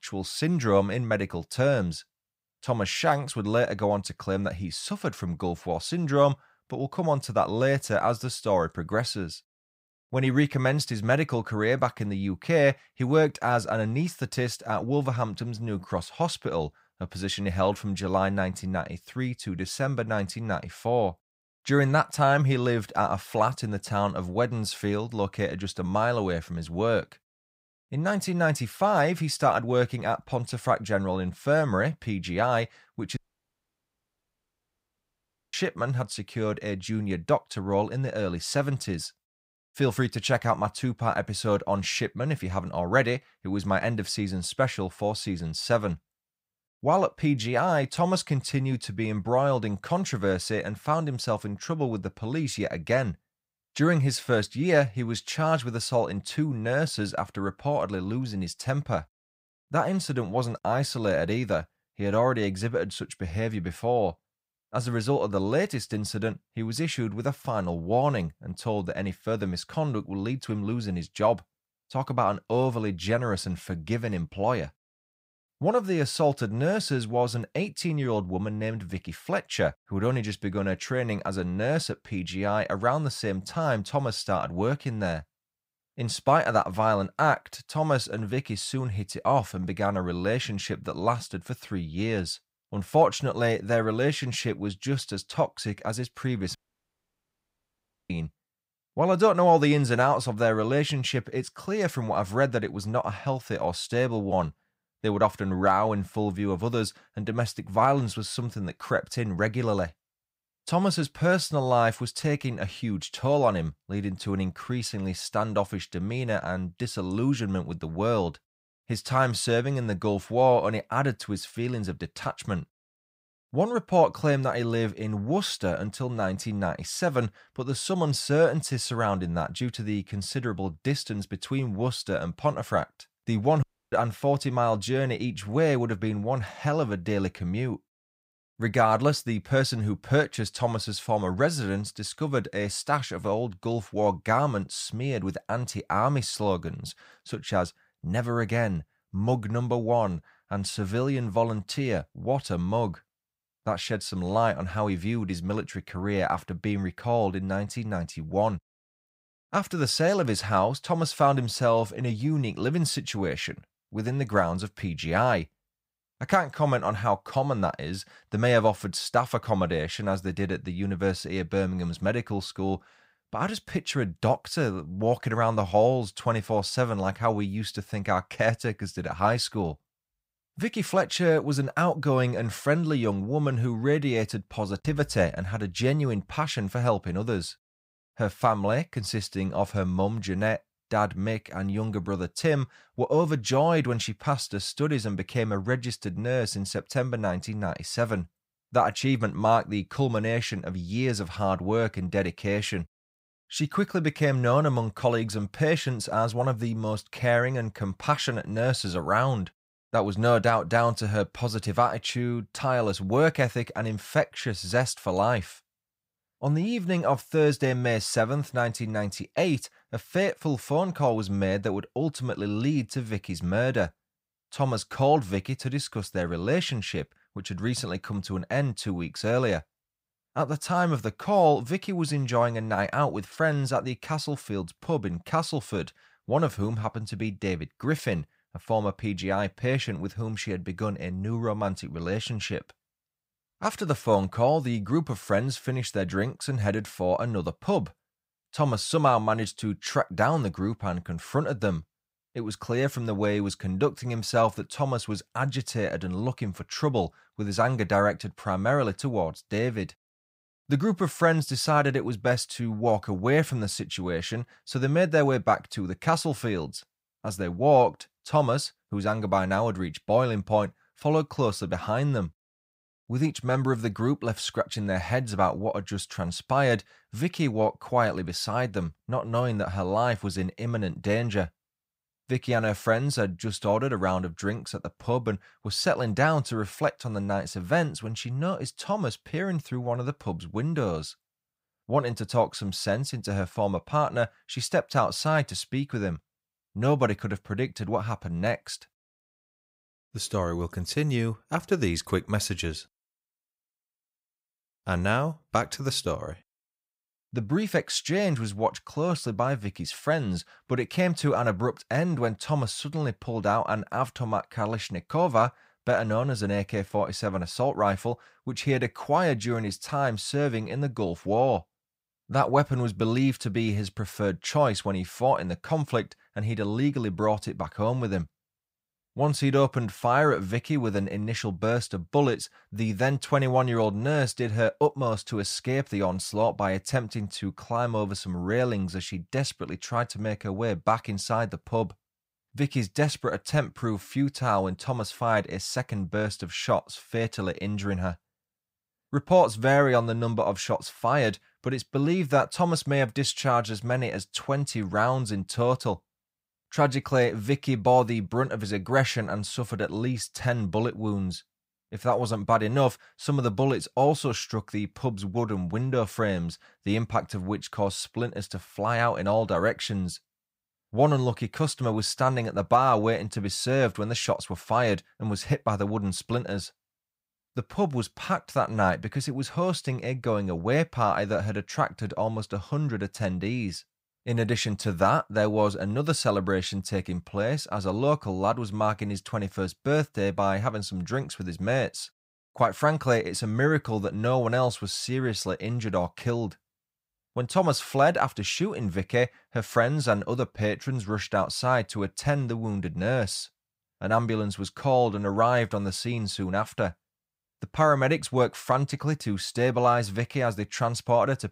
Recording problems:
audio cutting out; at 33 s for 2.5 s, at 1:37 for 1.5 s and at 2:14

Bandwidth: 15.5 kHz